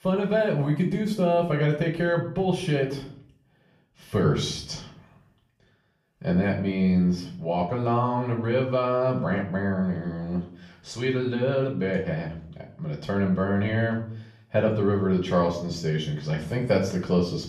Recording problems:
off-mic speech; far
room echo; slight; dies away in 0.5 s

